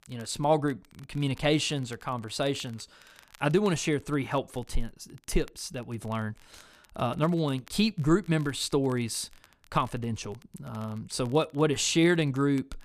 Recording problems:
crackle, like an old record; faint; 30 dB below the speech

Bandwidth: 14.5 kHz